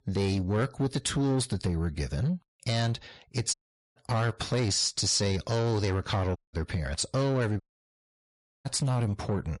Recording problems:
distortion; slight; 10 dB below the speech
garbled, watery; slightly; nothing above 10.5 kHz
audio cutting out; at 3.5 s, at 6.5 s and at 7.5 s for 1 s

